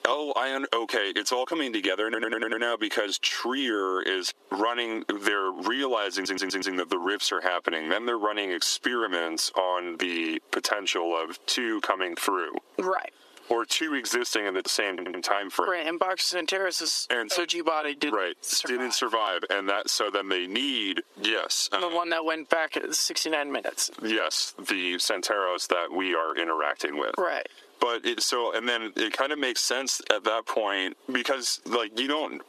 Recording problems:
thin; somewhat; fading below 350 Hz
squashed, flat; somewhat
audio stuttering; at 2 s, at 6 s and at 15 s

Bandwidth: 14 kHz